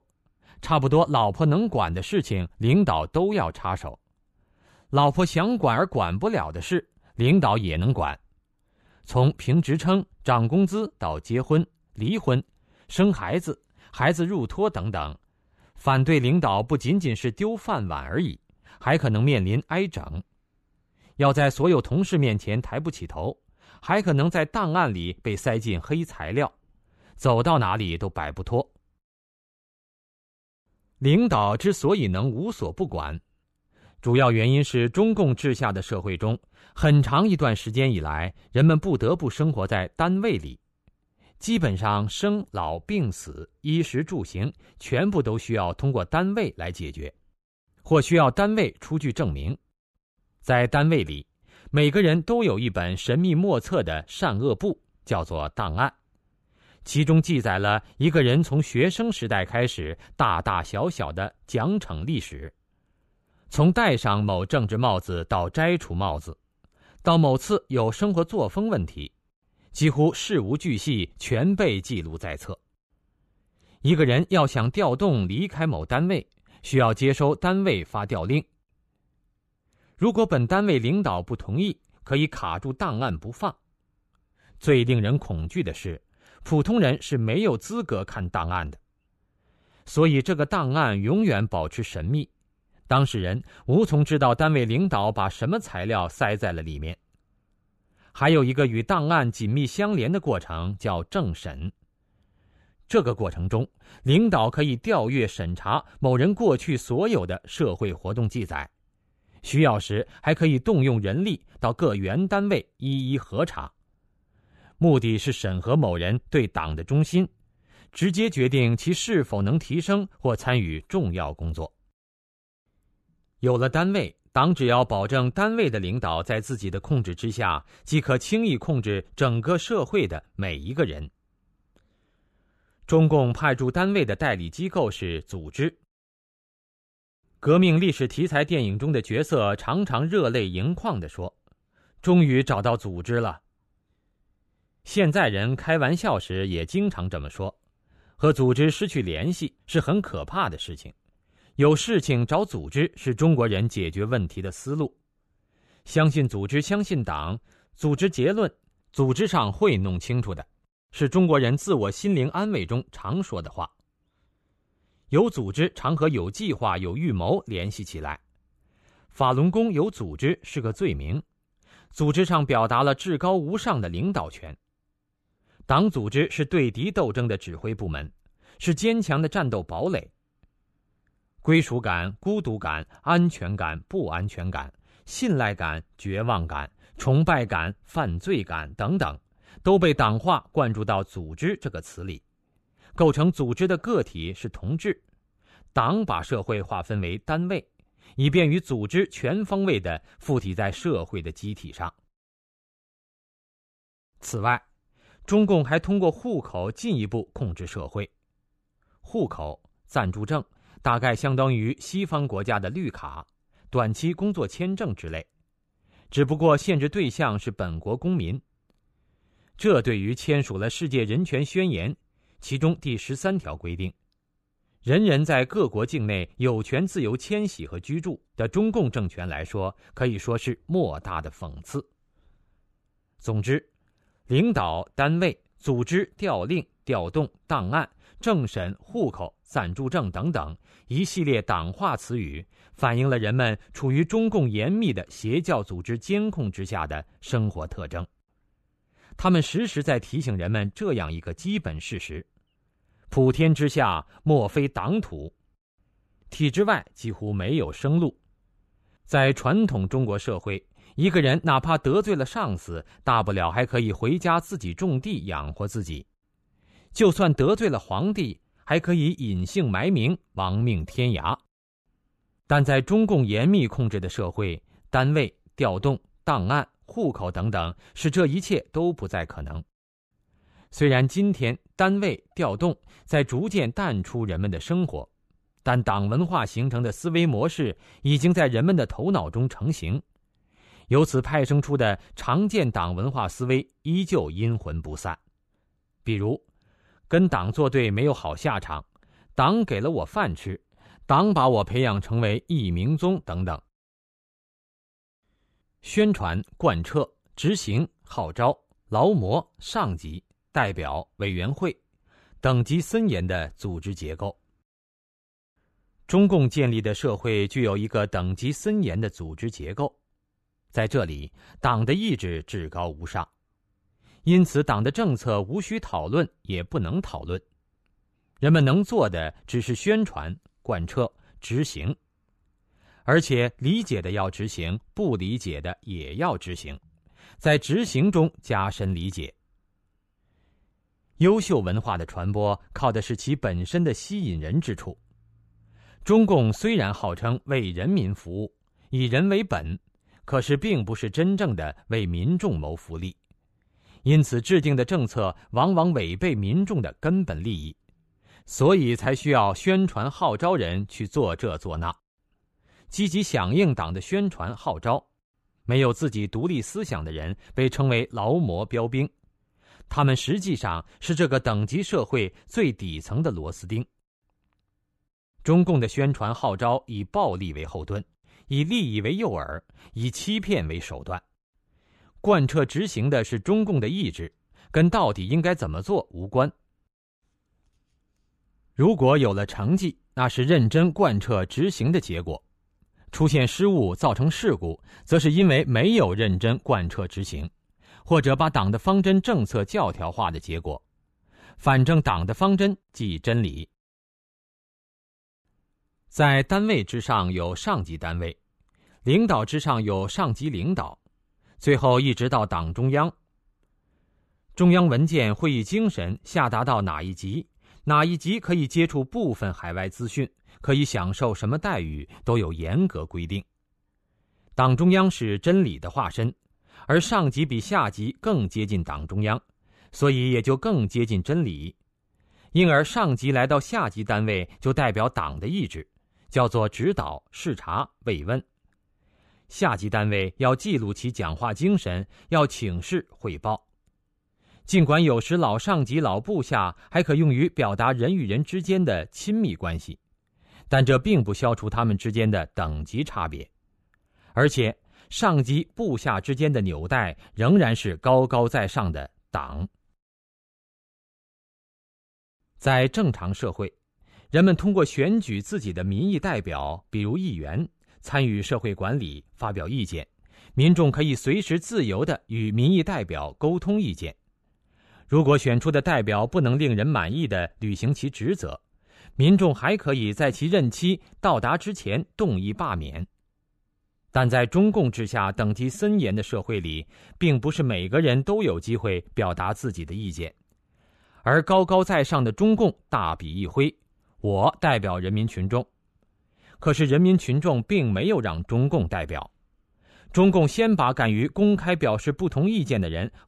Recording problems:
none

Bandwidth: 13.5 kHz